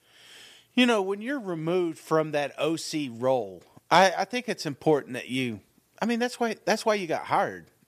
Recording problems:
none

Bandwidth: 14.5 kHz